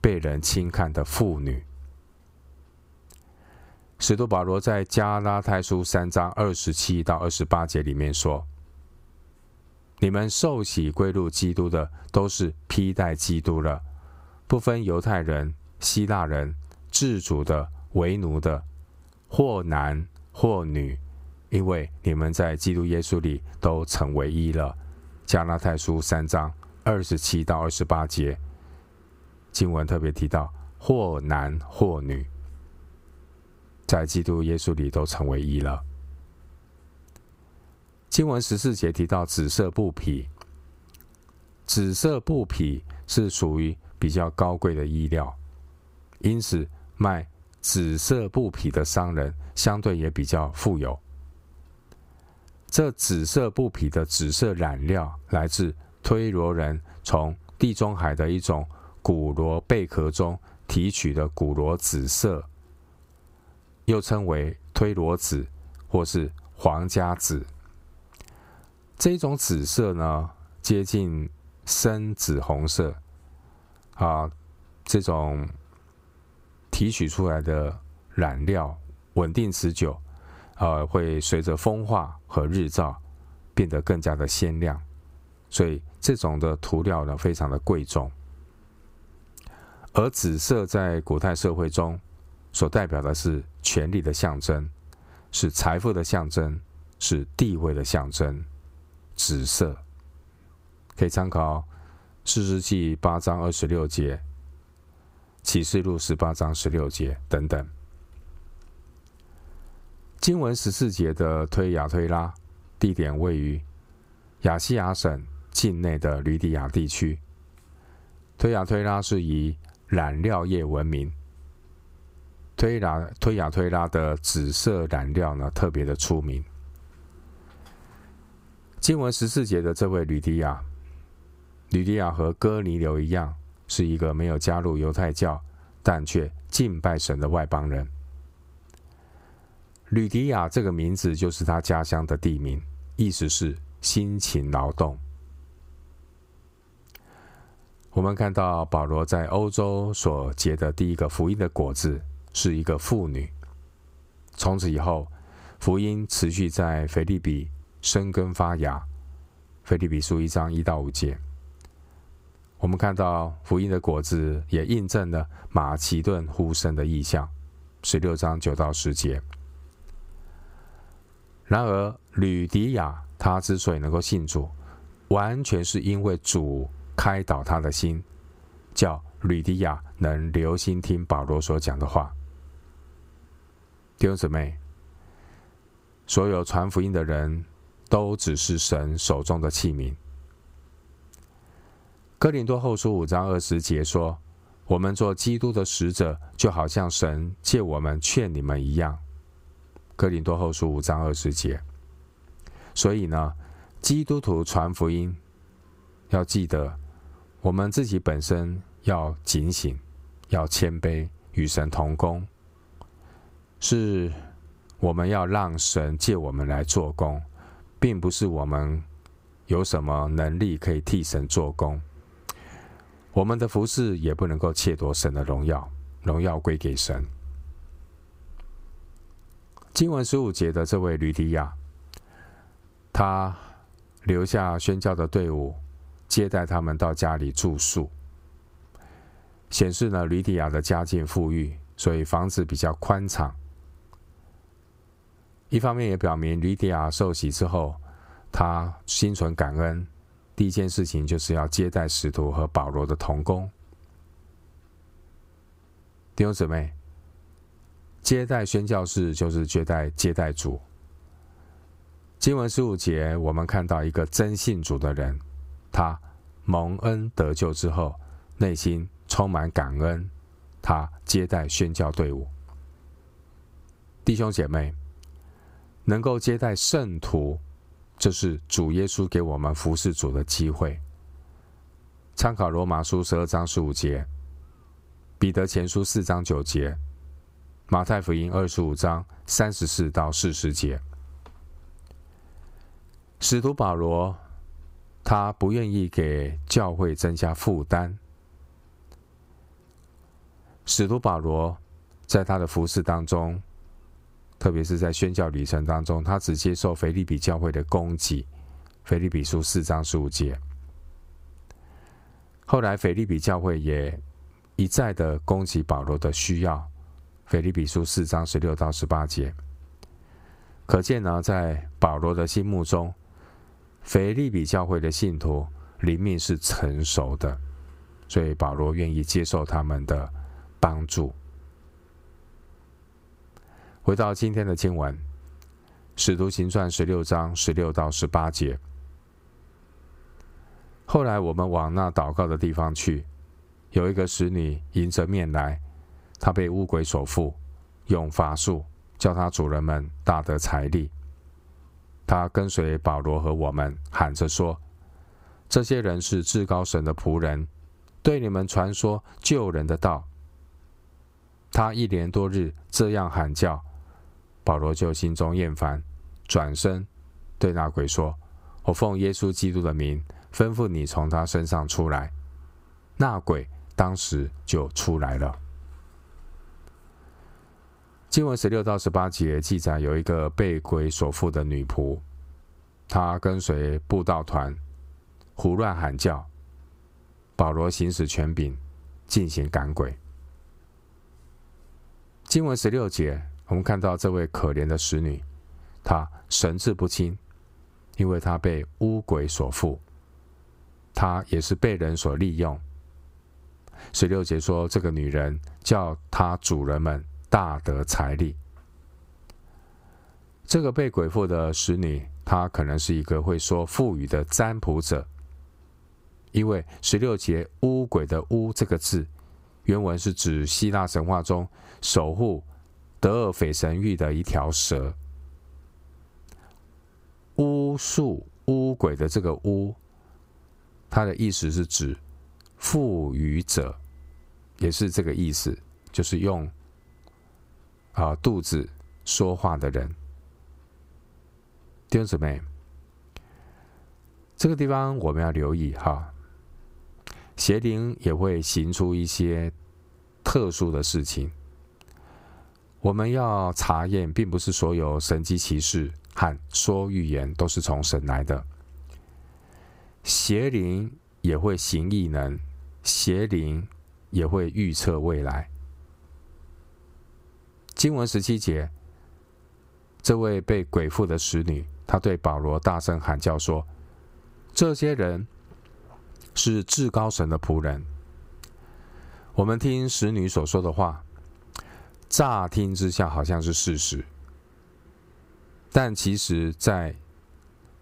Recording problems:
squashed, flat; somewhat

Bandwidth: 15.5 kHz